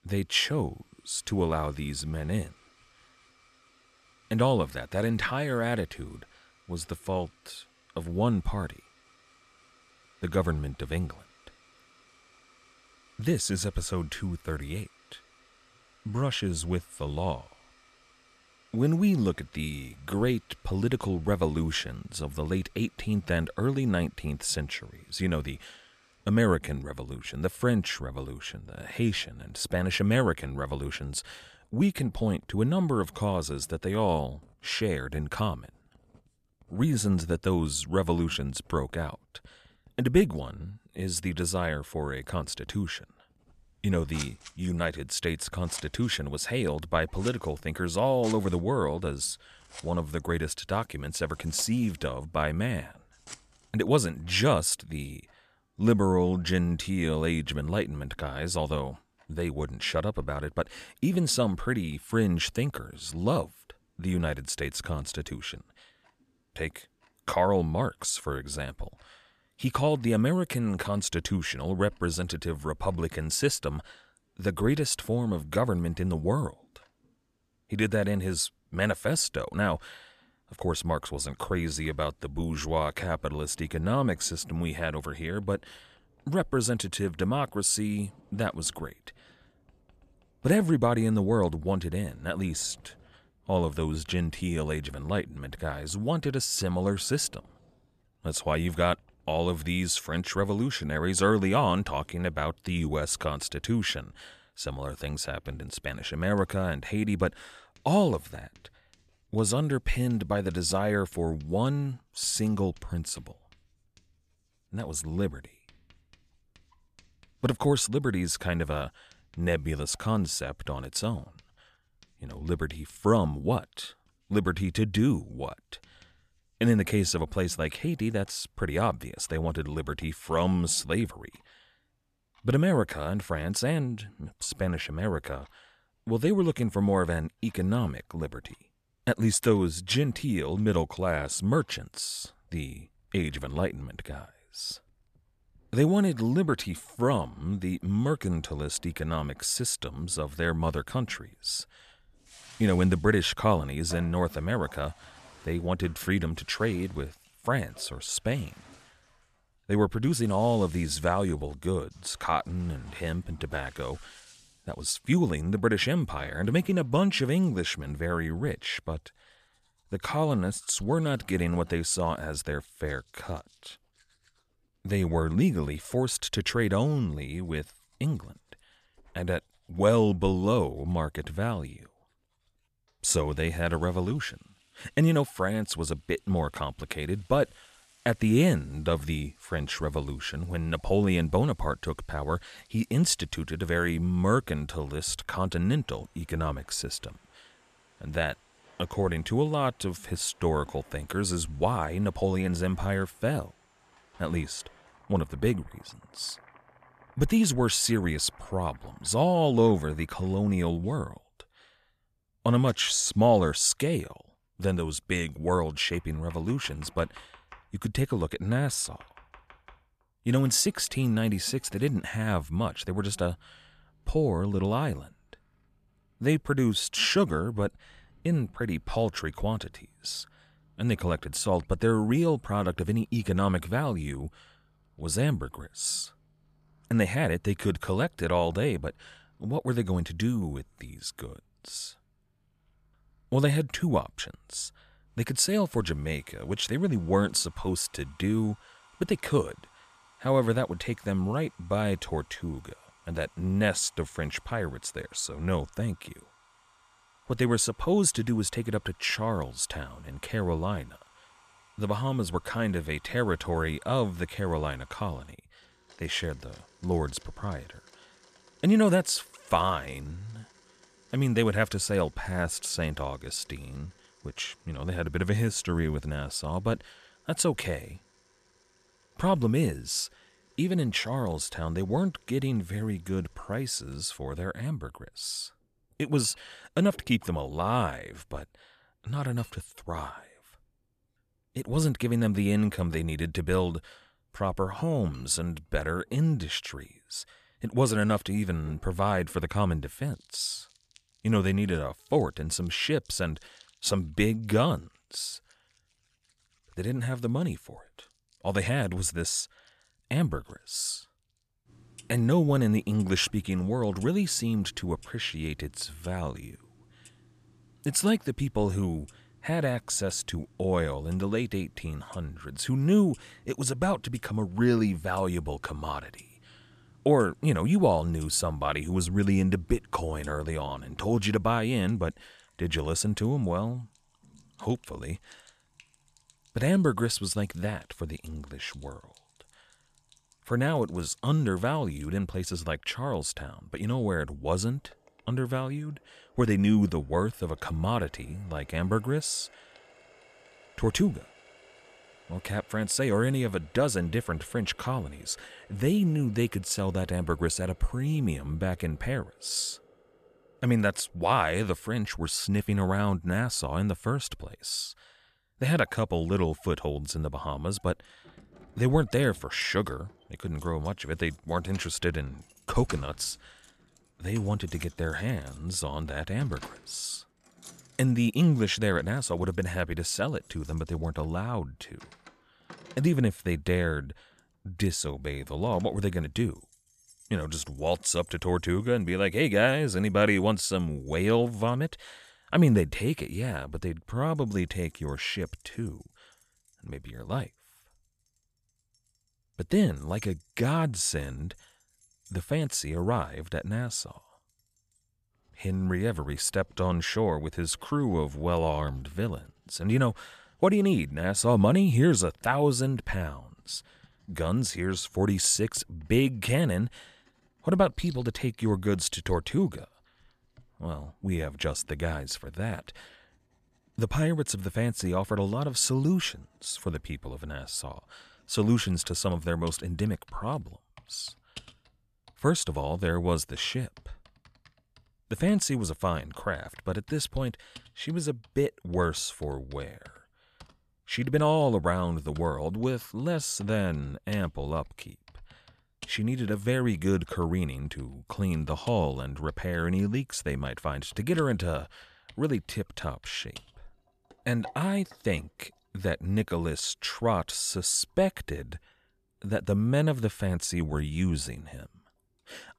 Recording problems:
household noises; faint; throughout; 30 dB below the speech

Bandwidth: 14.5 kHz